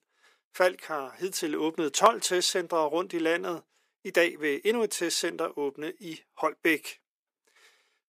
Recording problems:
thin; somewhat; fading below 300 Hz

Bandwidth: 15 kHz